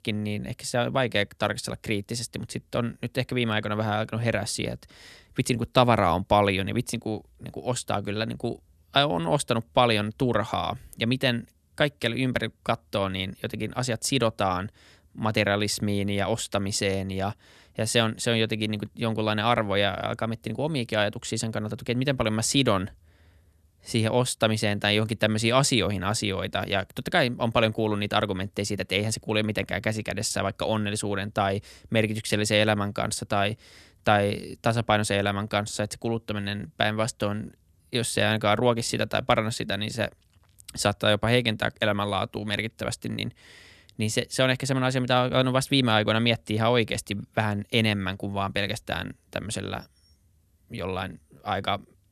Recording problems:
none

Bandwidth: 13.5 kHz